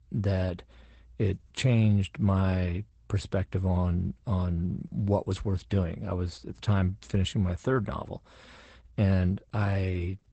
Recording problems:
garbled, watery; badly; nothing above 8 kHz

